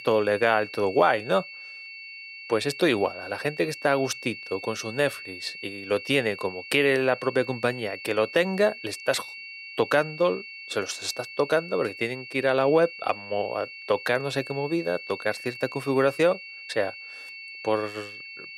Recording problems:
high-pitched whine; noticeable; throughout; 2.5 kHz, 10 dB below the speech

